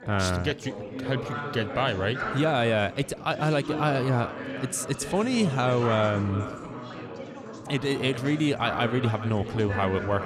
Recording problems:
echo of what is said; faint; from 3.5 s on; 430 ms later, 20 dB below the speech
background chatter; loud; throughout; 4 voices, 8 dB below the speech

